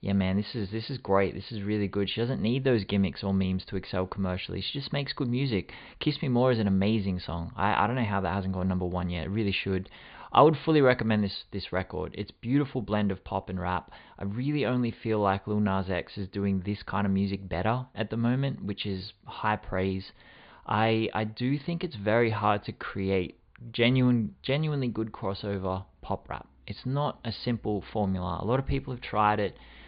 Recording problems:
high frequencies cut off; severe; nothing above 4.5 kHz

